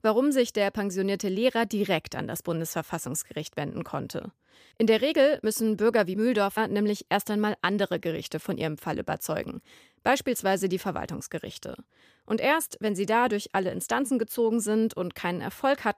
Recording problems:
none

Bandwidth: 15 kHz